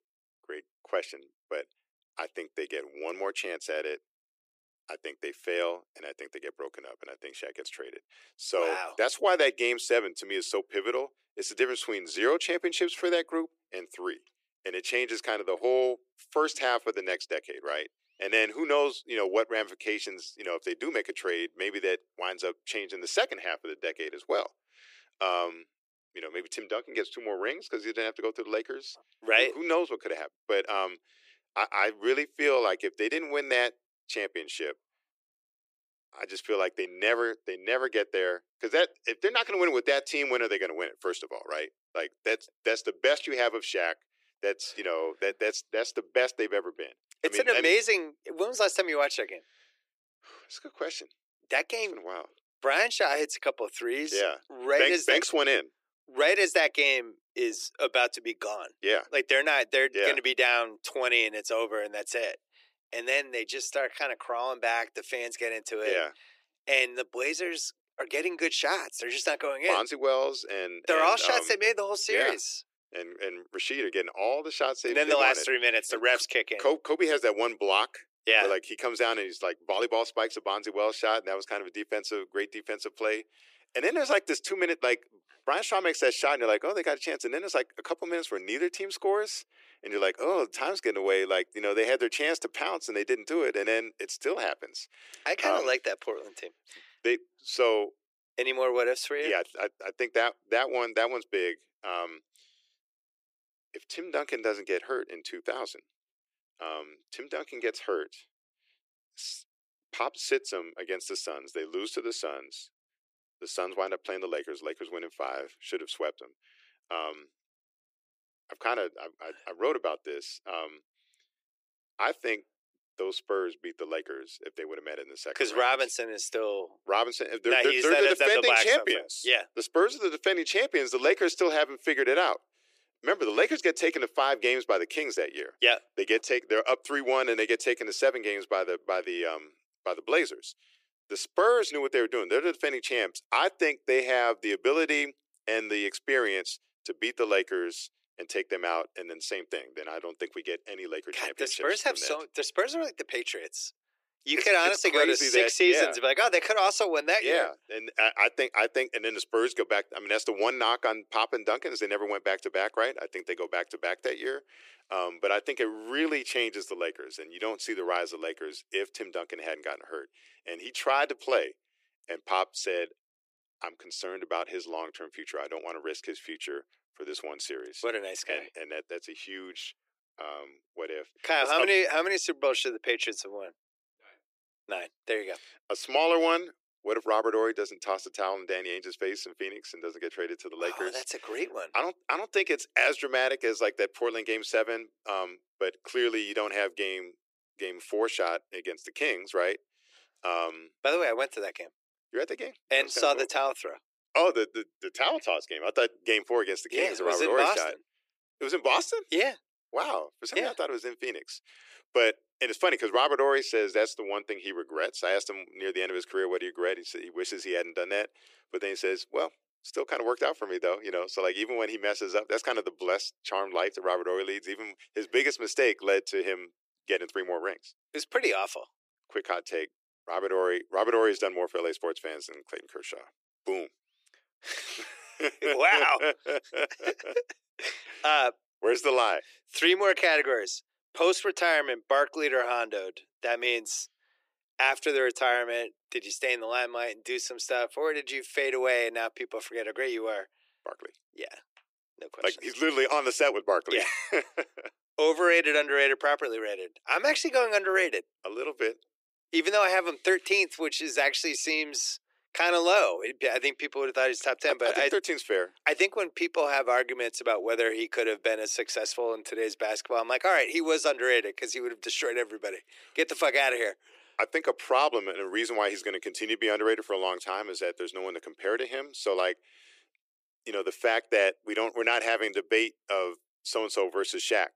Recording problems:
thin; very; fading below 350 Hz

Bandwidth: 15 kHz